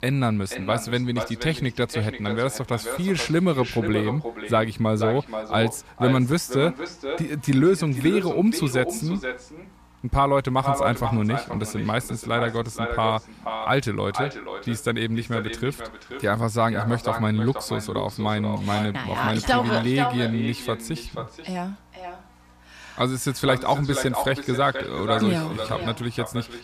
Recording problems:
echo of what is said; strong; throughout; 480 ms later, 8 dB below the speech
electrical hum; faint; throughout; 60 Hz, 30 dB below the speech

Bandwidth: 14.5 kHz